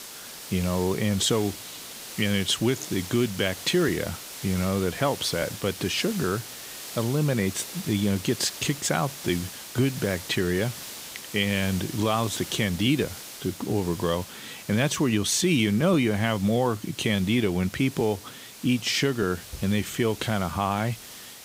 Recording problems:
hiss; noticeable; throughout; 10 dB below the speech

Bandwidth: 15.5 kHz